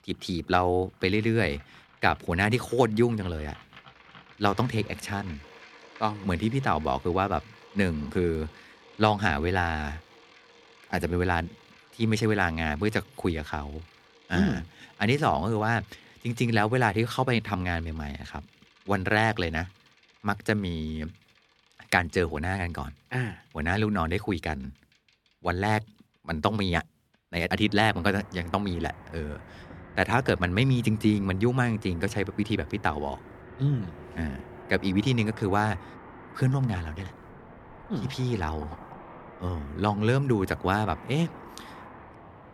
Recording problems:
traffic noise; faint; throughout; 20 dB below the speech

